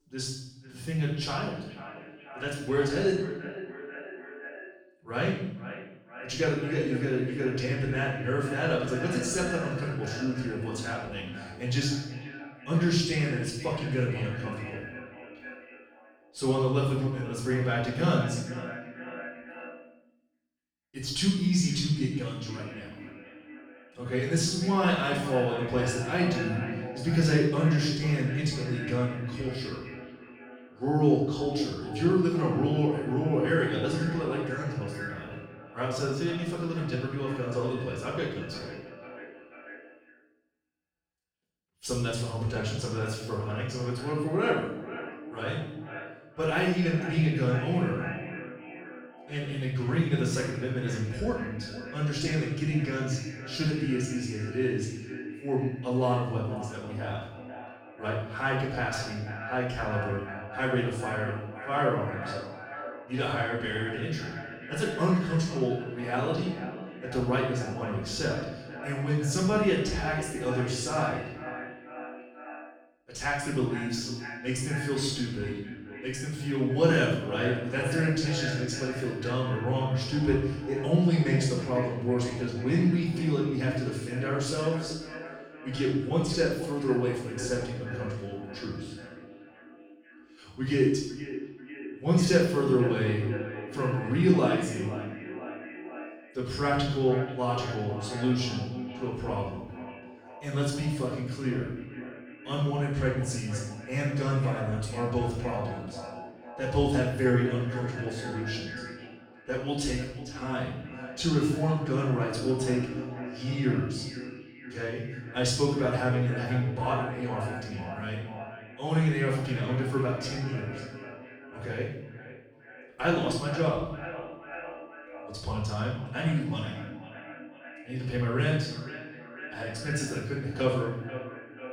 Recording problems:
echo of what is said; strong; throughout; 490 ms later, 10 dB below the speech
off-mic speech; far
room echo; noticeable; dies away in 0.7 s

